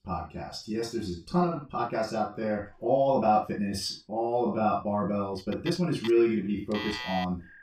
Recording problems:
off-mic speech; far
room echo; noticeable; dies away in 0.2 s
alarms or sirens; noticeable; from 5.5 s on; 10 dB below the speech
uneven, jittery; strongly; from 0.5 to 7 s

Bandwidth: 15.5 kHz